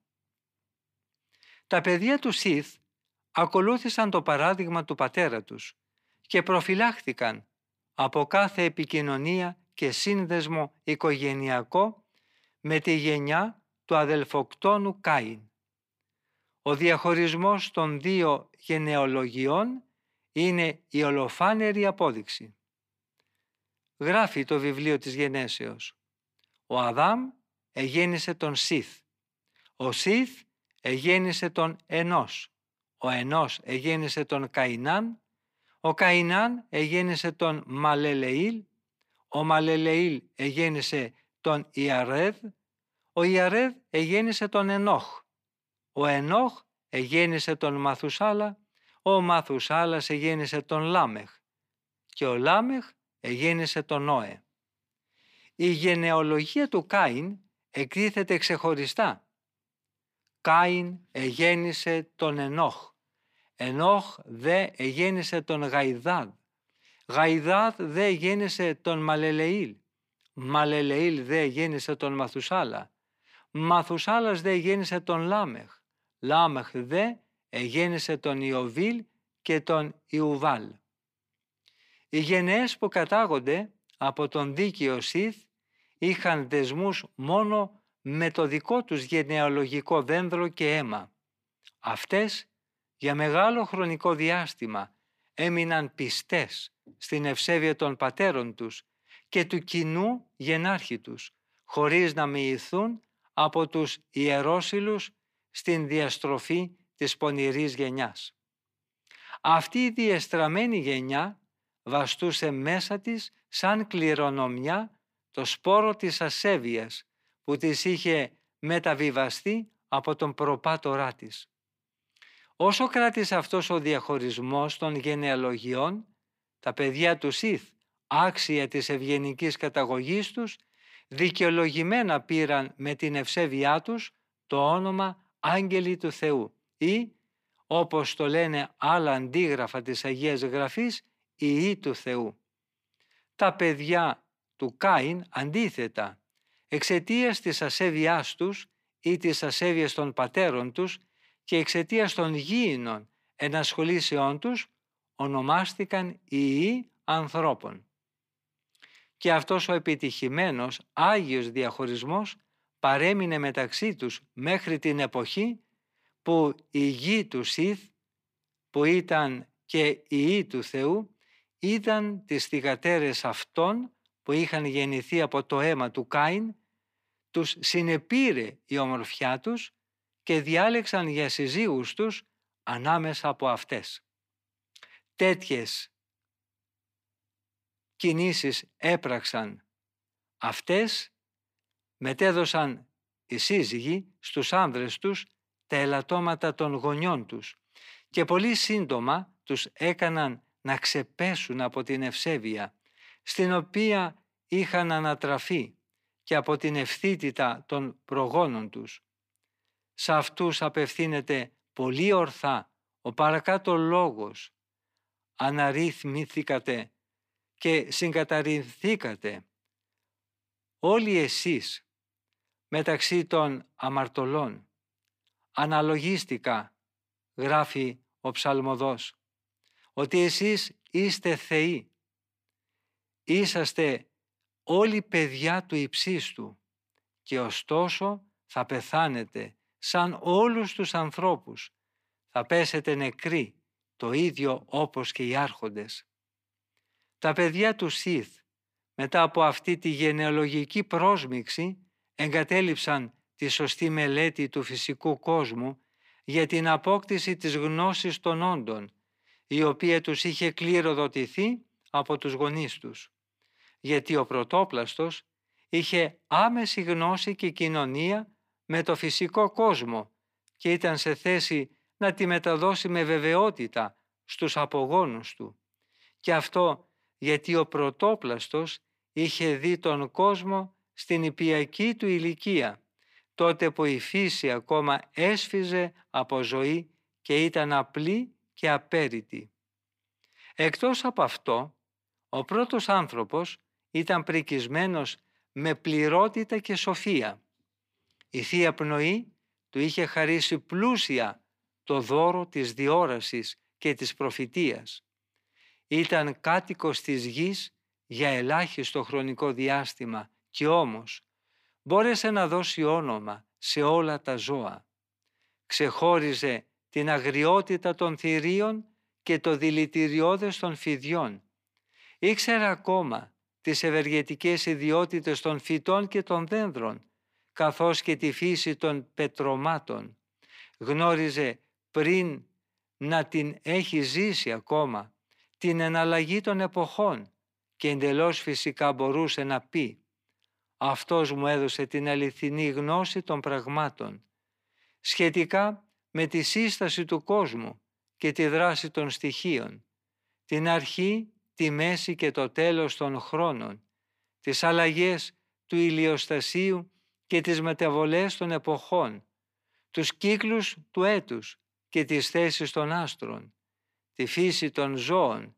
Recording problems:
thin; very slightly; fading below 250 Hz

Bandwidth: 15 kHz